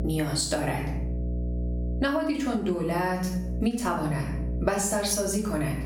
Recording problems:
off-mic speech; far
room echo; slight; dies away in 0.5 s
squashed, flat; somewhat
electrical hum; noticeable; throughout; 60 Hz, 15 dB below the speech

